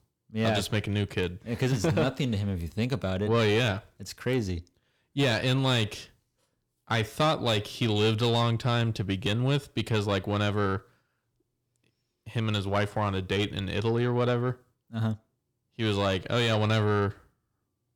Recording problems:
distortion; slight; 10 dB below the speech

